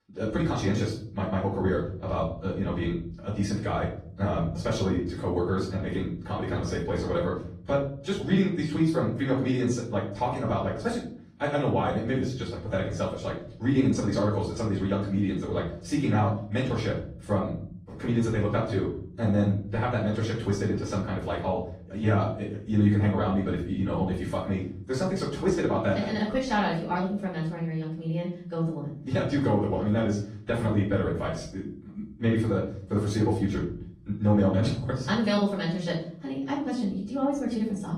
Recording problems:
off-mic speech; far
wrong speed, natural pitch; too fast; 1.5 times normal speed
room echo; noticeable; dies away in 0.7 s
garbled, watery; slightly; nothing above 15 kHz

